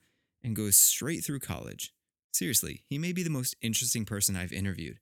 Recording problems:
none

